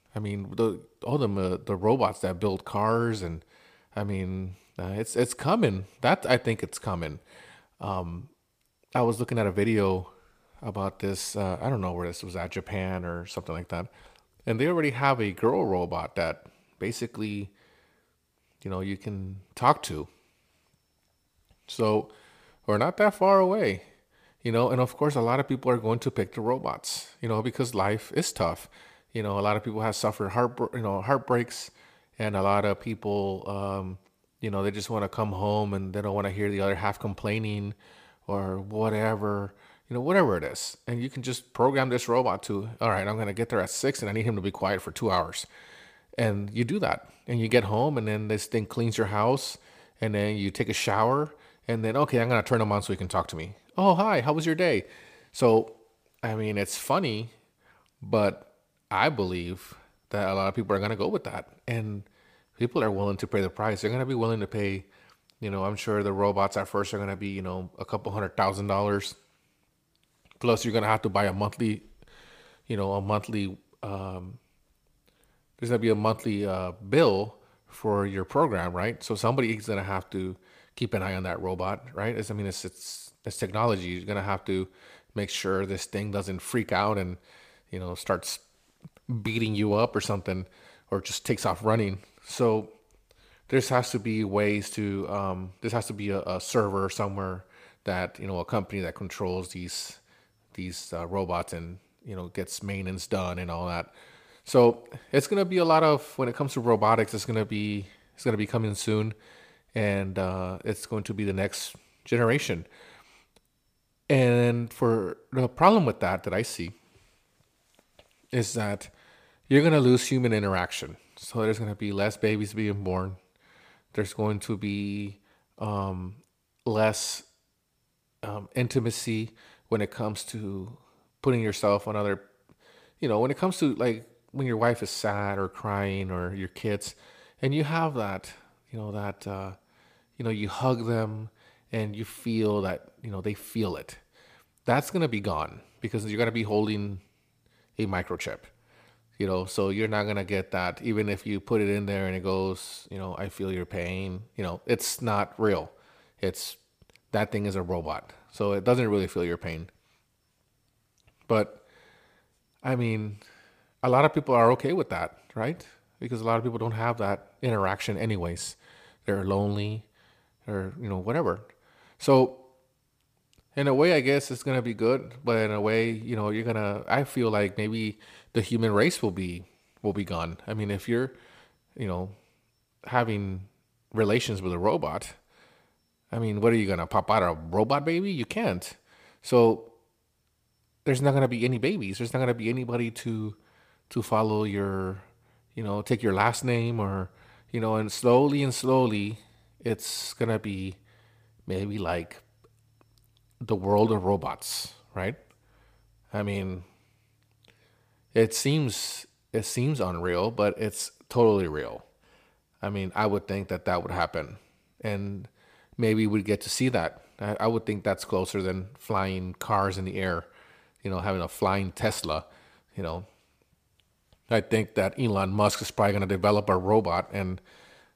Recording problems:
none

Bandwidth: 15 kHz